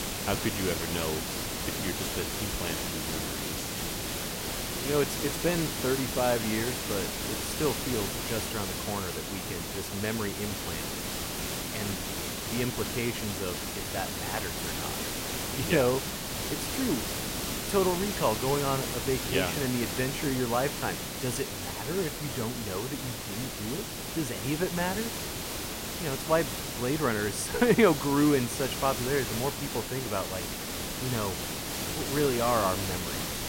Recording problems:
hiss; loud; throughout; 1 dB below the speech

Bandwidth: 16 kHz